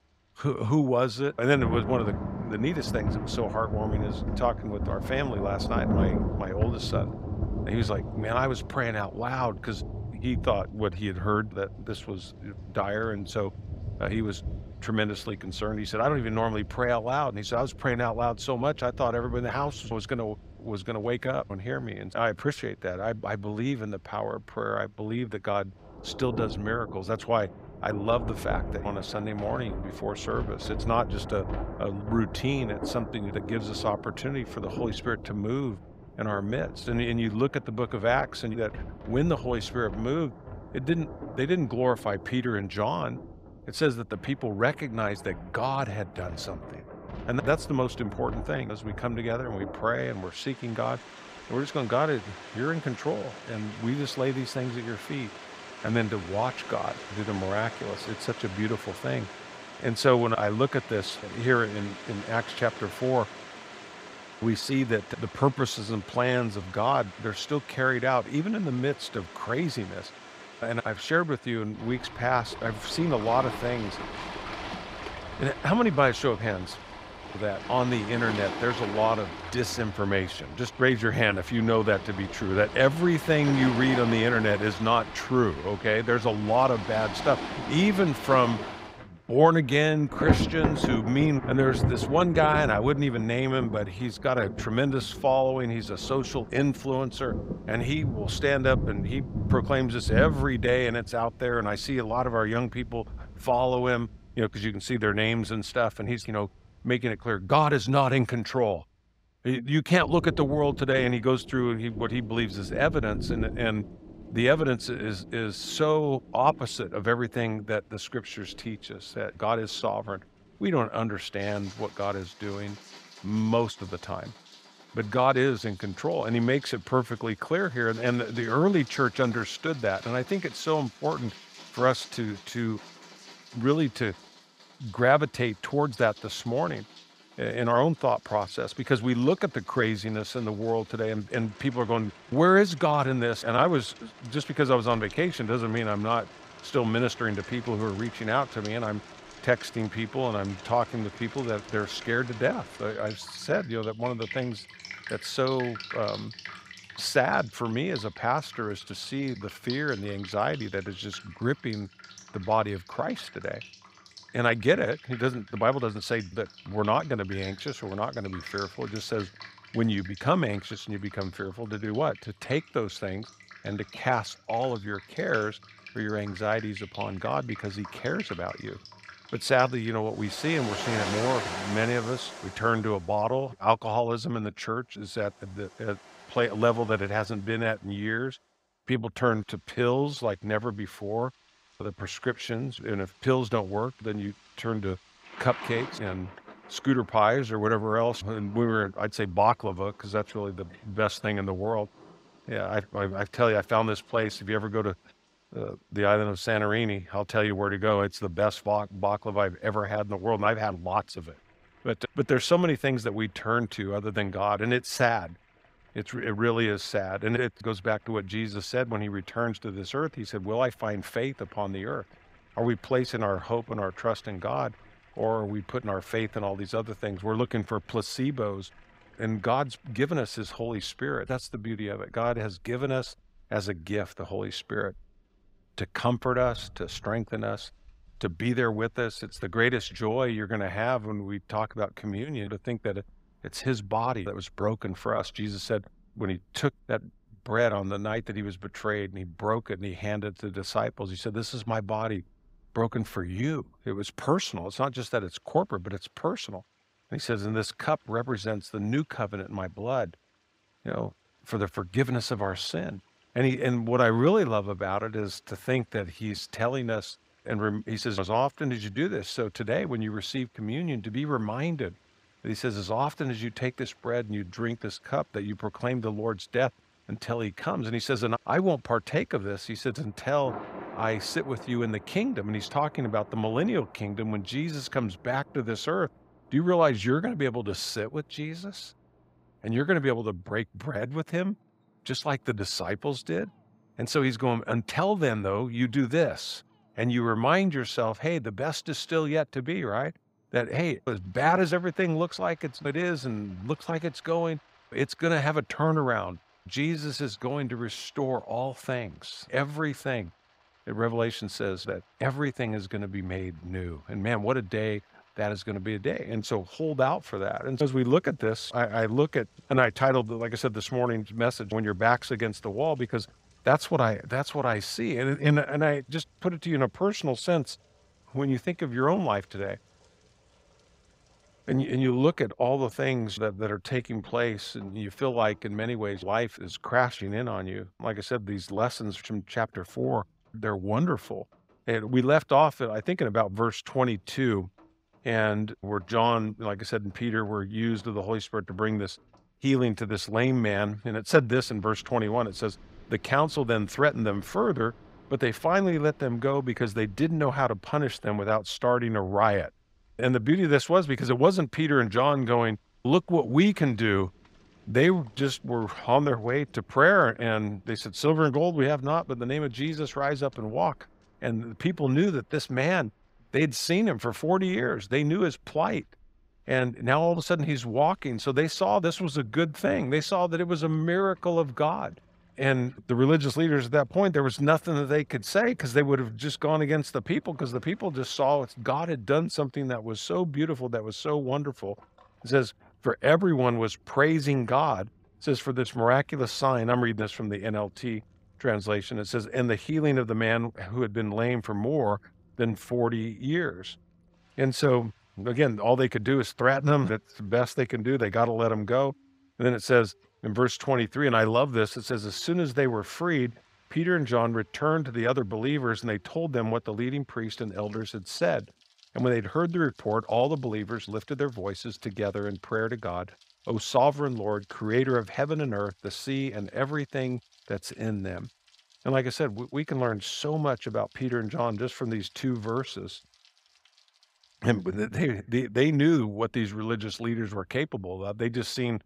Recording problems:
rain or running water; noticeable; throughout; 10 dB below the speech

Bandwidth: 15.5 kHz